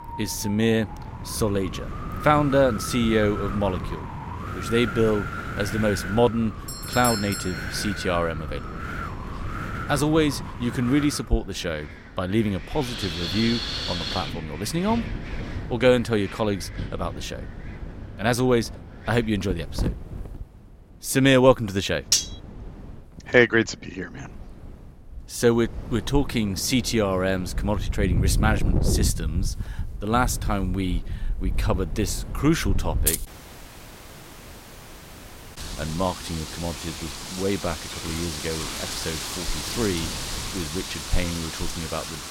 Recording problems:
wind in the background; loud; throughout; 7 dB below the speech
doorbell; noticeable; at 6.5 s; peak 3 dB below the speech
clattering dishes; loud; at 22 s; peak 4 dB above the speech
jangling keys; loud; at 33 s; peak 1 dB above the speech
audio cutting out; at 33 s for 2.5 s

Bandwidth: 16 kHz